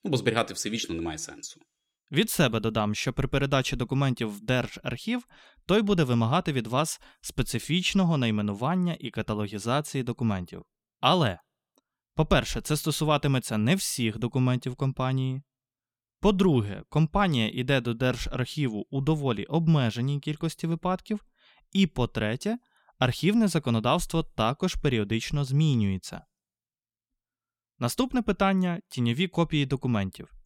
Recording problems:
none

